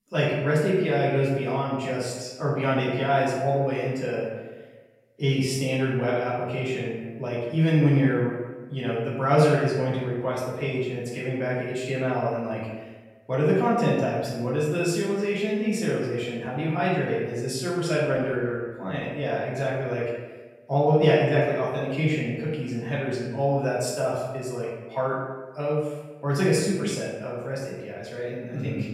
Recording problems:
off-mic speech; far
room echo; noticeable; dies away in 1 s

